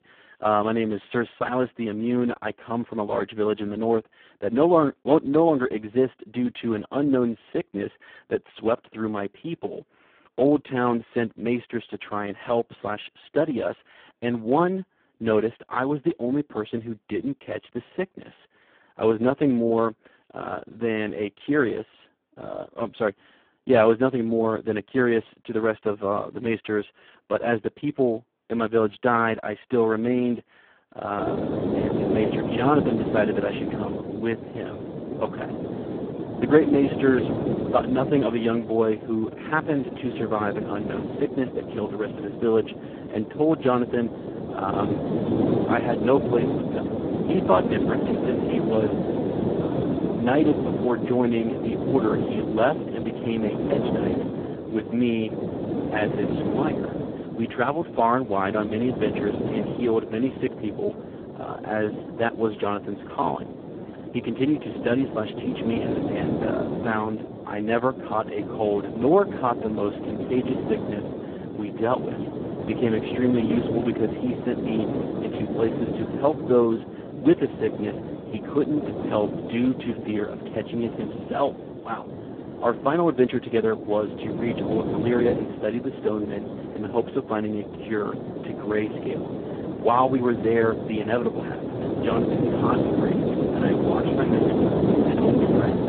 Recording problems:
phone-call audio; poor line
wind noise on the microphone; heavy; from 31 s on; 5 dB below the speech

